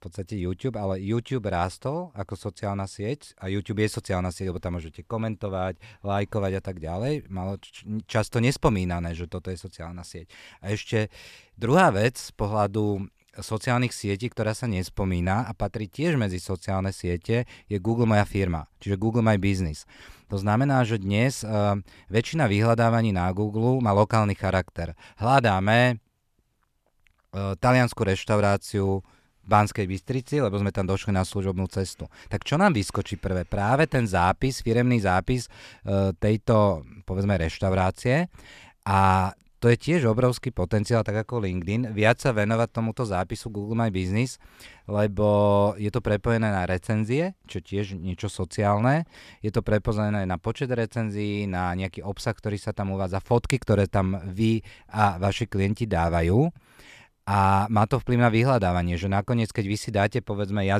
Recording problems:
abrupt cut into speech; at the end

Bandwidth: 14.5 kHz